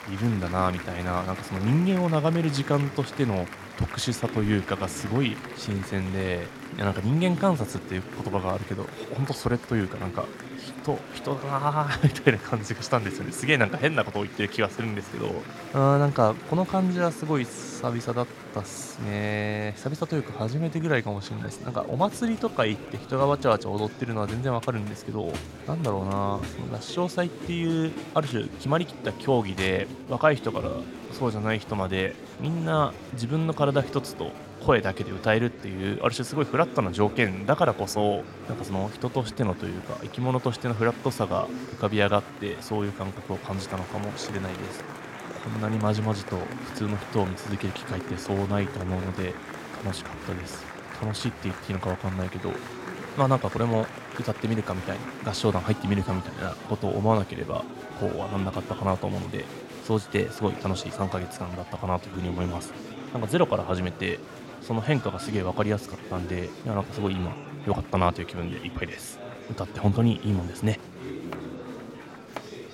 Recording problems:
murmuring crowd; noticeable; throughout; 10 dB below the speech

